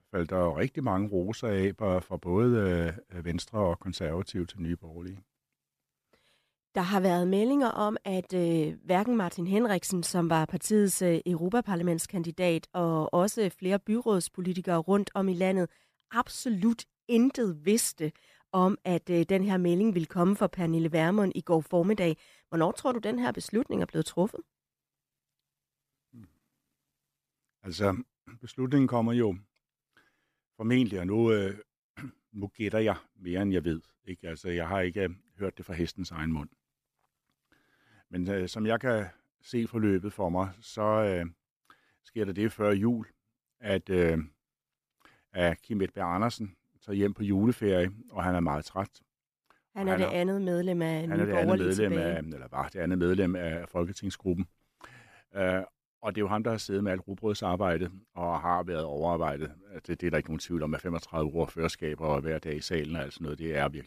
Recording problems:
none

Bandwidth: 14.5 kHz